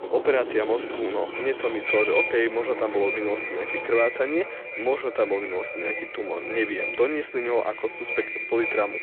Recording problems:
echo of what is said; strong; throughout; 520 ms later, 4 dB below the speech
phone-call audio
traffic noise; loud; until 4 s; 10 dB below the speech

